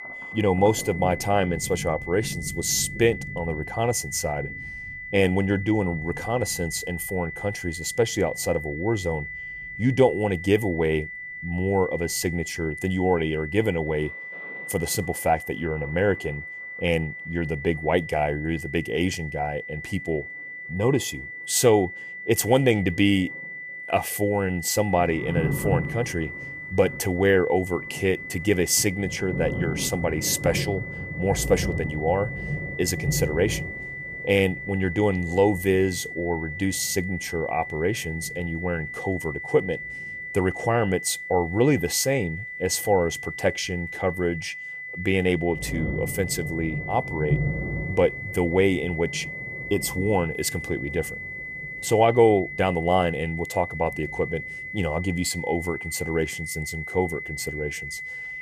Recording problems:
high-pitched whine; loud; throughout; 2 kHz, 9 dB below the speech
rain or running water; noticeable; throughout; 10 dB below the speech

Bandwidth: 14.5 kHz